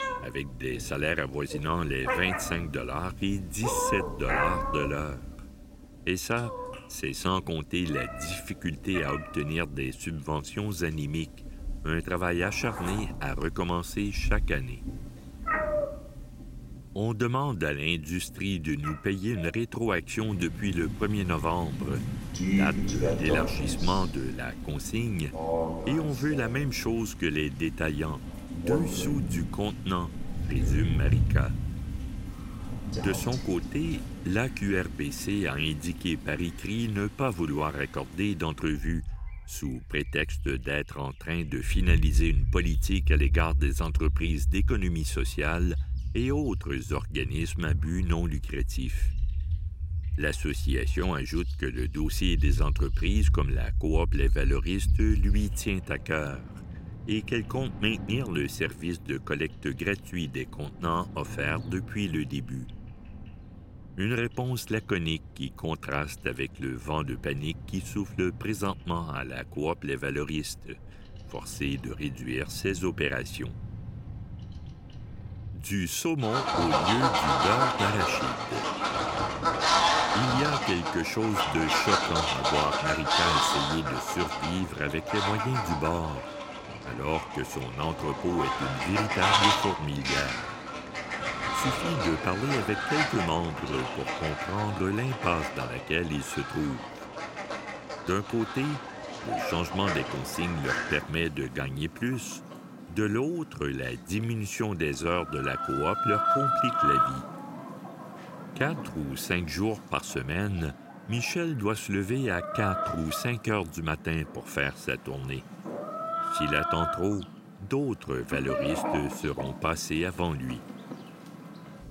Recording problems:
animal sounds; very loud; throughout; as loud as the speech

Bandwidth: 16 kHz